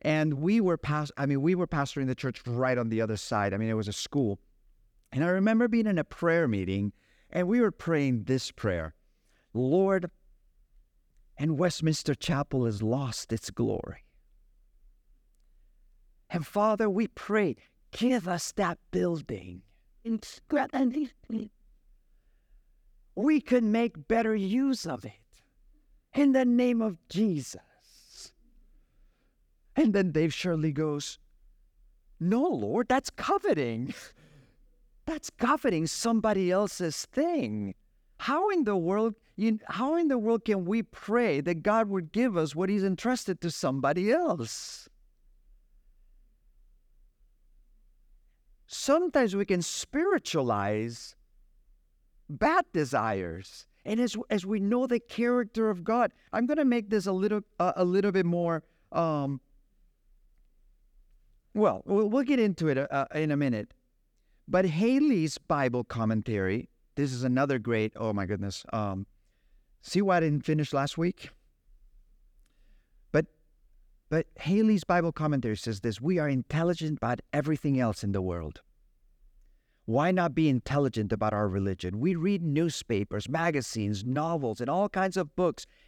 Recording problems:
none

